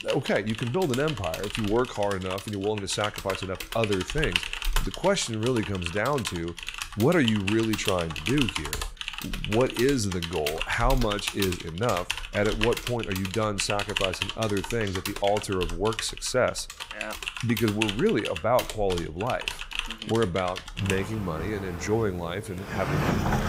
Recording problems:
household noises; loud; throughout; 5 dB below the speech

